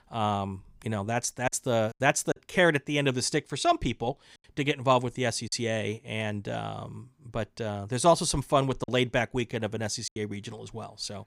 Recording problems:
choppy; occasionally; 3% of the speech affected

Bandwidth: 15.5 kHz